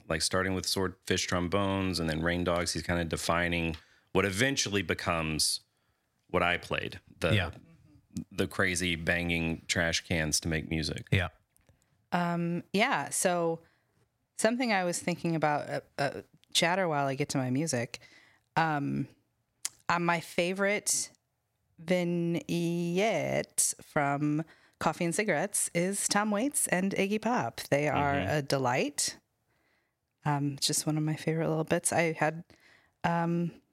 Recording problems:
squashed, flat; somewhat

